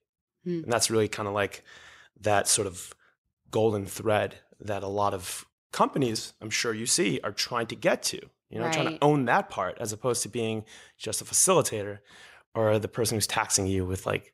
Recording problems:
none

